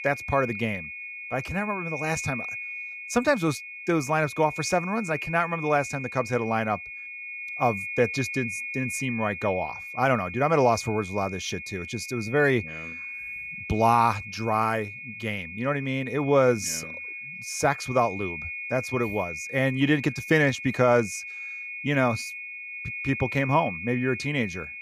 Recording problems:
high-pitched whine; loud; throughout; 2.5 kHz, 8 dB below the speech

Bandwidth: 15 kHz